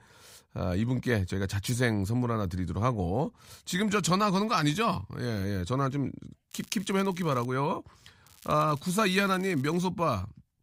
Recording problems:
crackling; faint; at 6.5 s and from 8.5 to 10 s; 25 dB below the speech

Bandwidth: 15.5 kHz